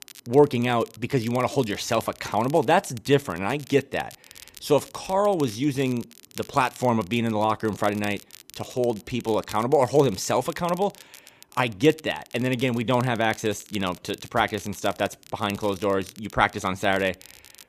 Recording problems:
crackle, like an old record; faint; 20 dB below the speech

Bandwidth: 14.5 kHz